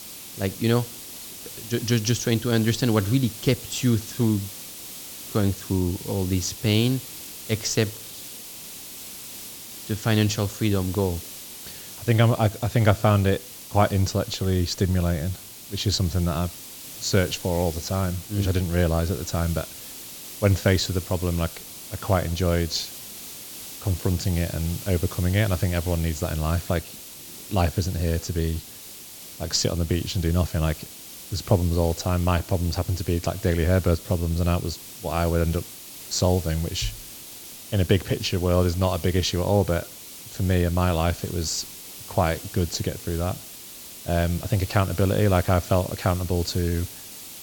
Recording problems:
high frequencies cut off; noticeable; nothing above 8 kHz
hiss; noticeable; throughout; 10 dB below the speech

